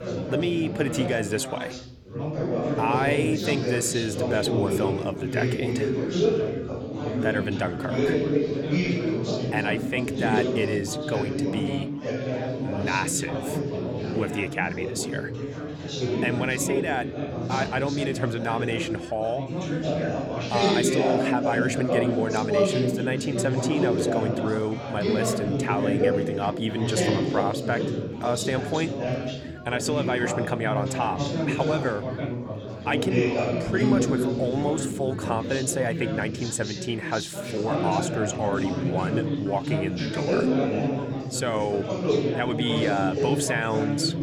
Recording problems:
chatter from many people; very loud; throughout; 1 dB above the speech

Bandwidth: 18 kHz